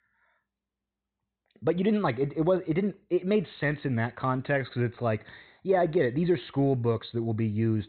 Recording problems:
high frequencies cut off; severe; nothing above 4 kHz

